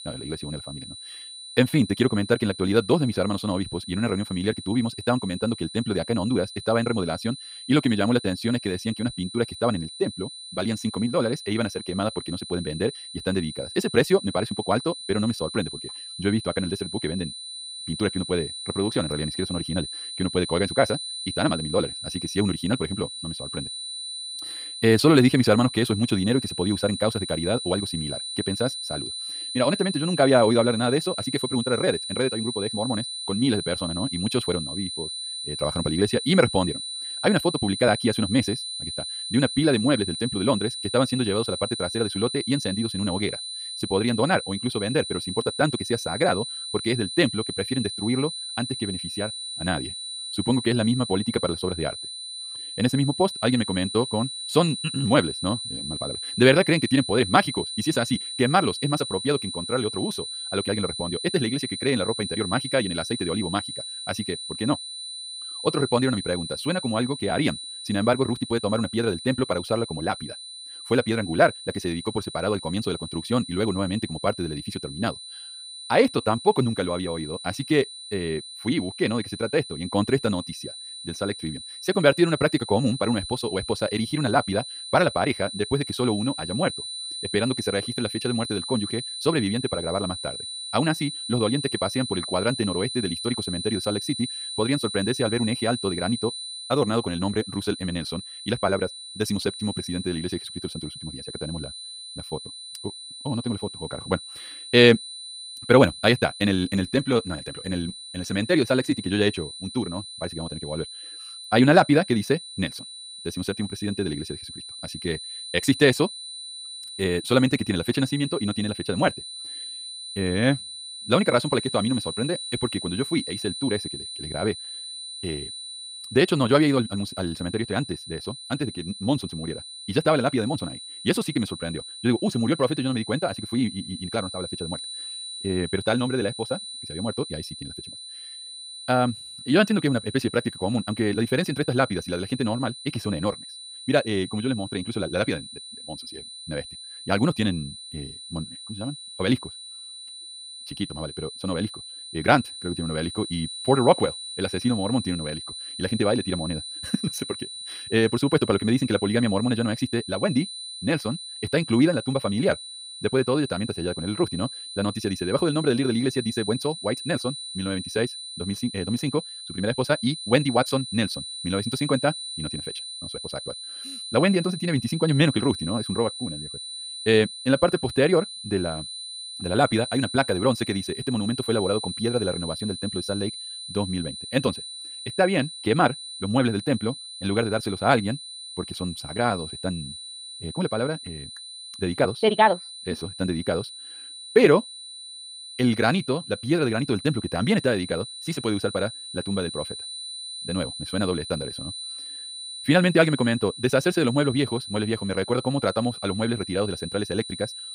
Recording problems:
wrong speed, natural pitch; too fast; 1.7 times normal speed
high-pitched whine; loud; throughout; 4 kHz, 8 dB below the speech

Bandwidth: 15.5 kHz